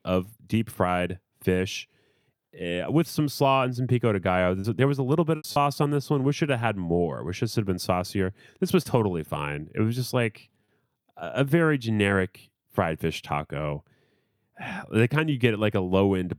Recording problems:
choppy; occasionally; 1% of the speech affected

